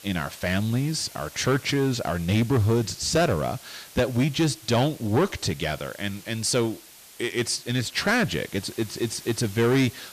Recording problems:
distortion; slight; 10 dB below the speech
hiss; noticeable; throughout; 20 dB below the speech

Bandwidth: 14.5 kHz